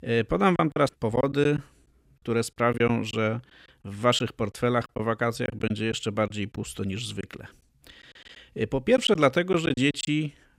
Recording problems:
choppy; very; 7% of the speech affected

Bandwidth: 15.5 kHz